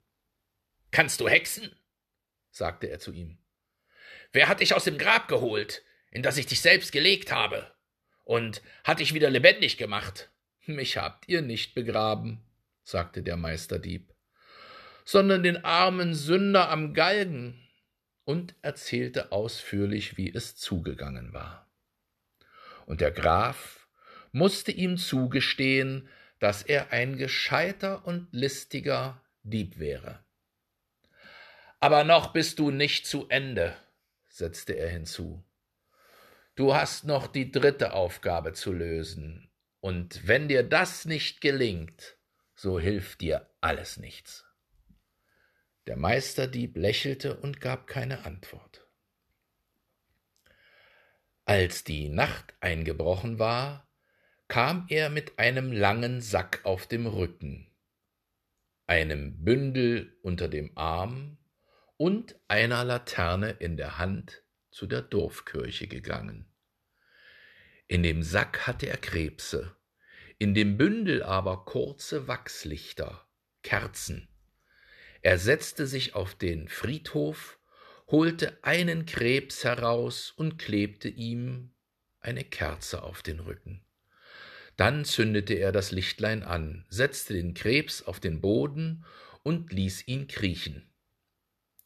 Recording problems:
none

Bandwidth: 13.5 kHz